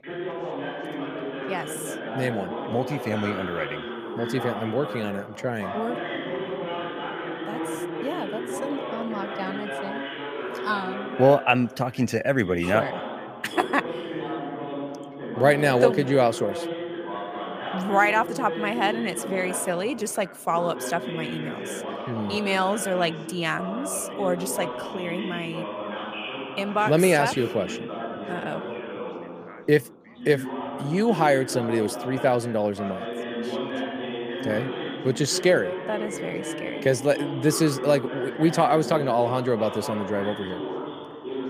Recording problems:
background chatter; loud; throughout; 3 voices, 7 dB below the speech

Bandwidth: 15 kHz